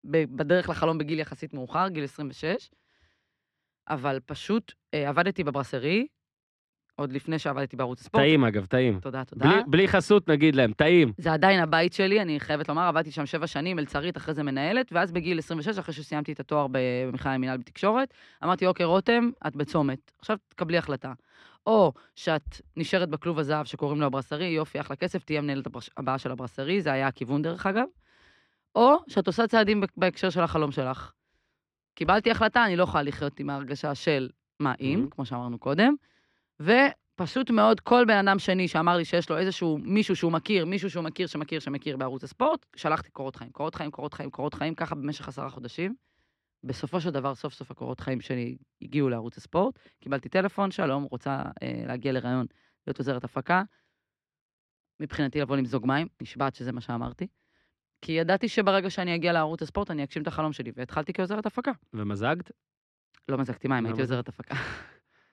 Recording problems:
muffled; slightly; fading above 3 kHz

